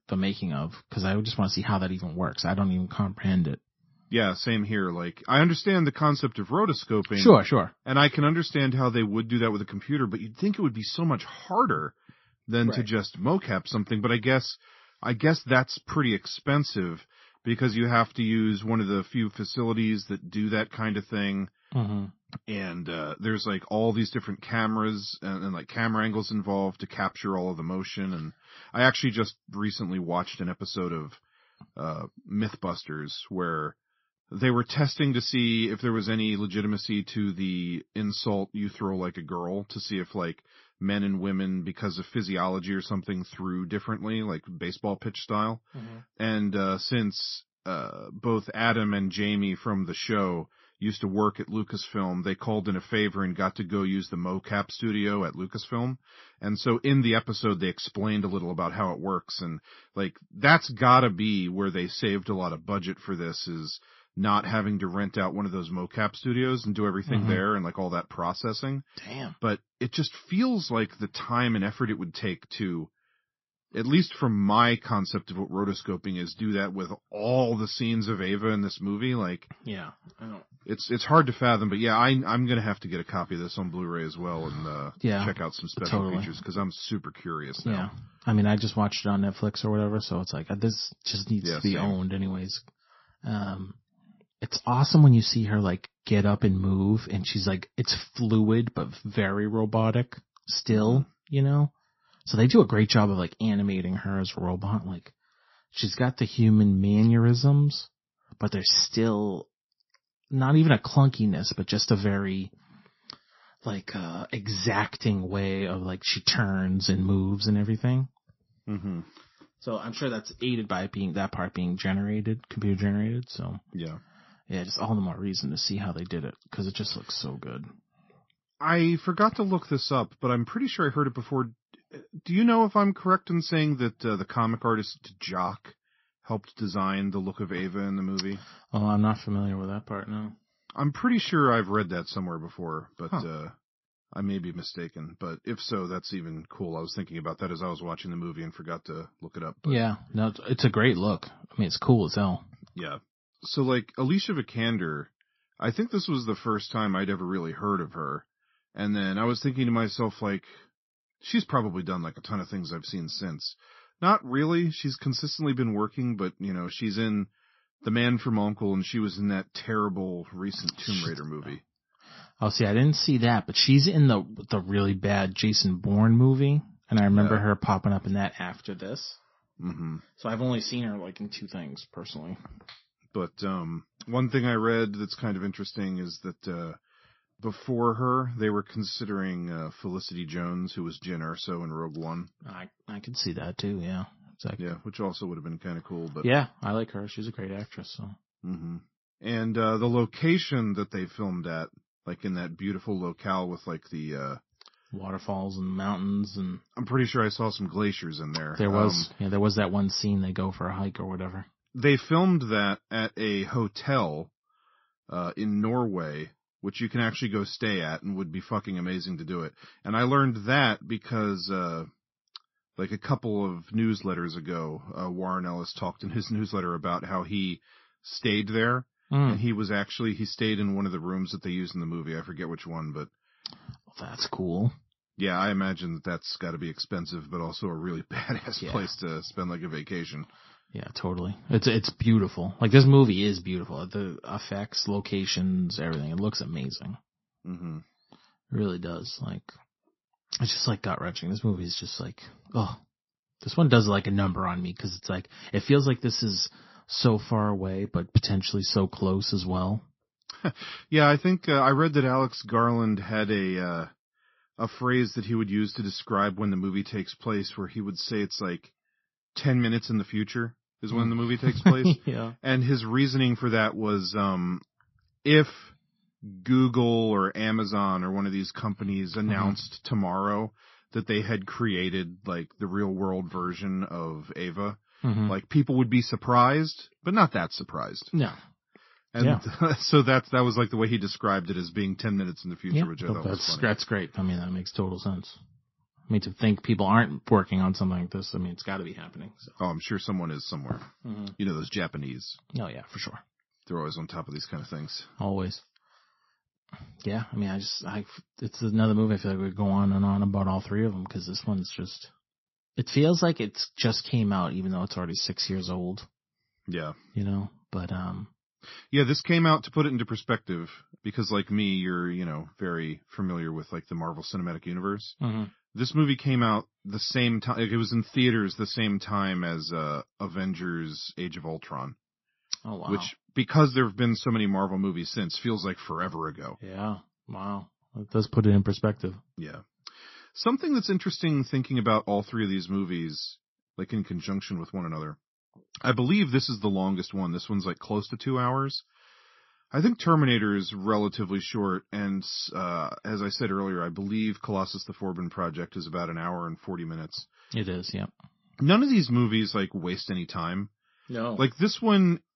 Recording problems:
garbled, watery; slightly; nothing above 5.5 kHz

